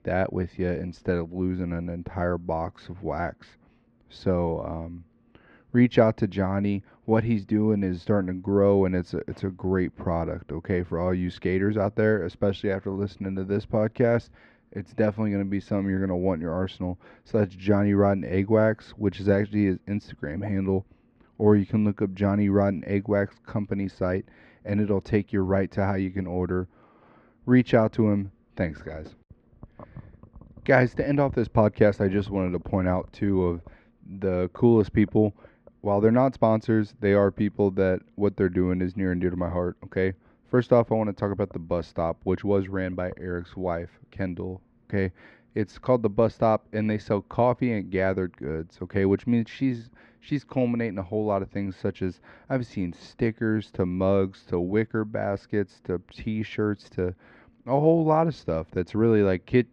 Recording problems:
muffled; very; fading above 2 kHz

